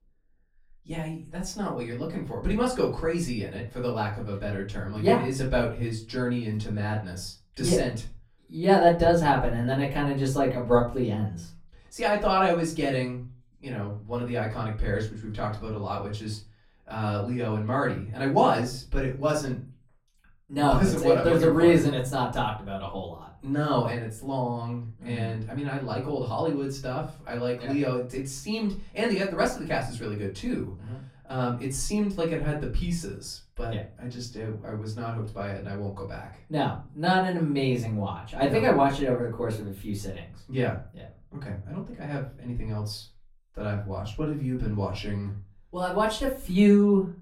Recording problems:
off-mic speech; far
room echo; slight; dies away in 0.3 s

